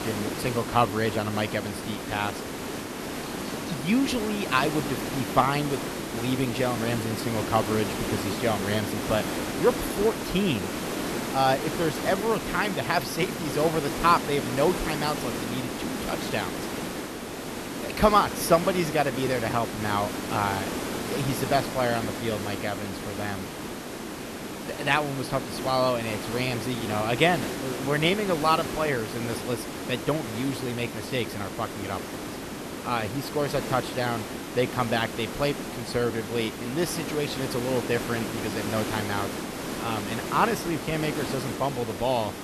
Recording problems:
hiss; loud; throughout; 5 dB below the speech

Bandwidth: 13.5 kHz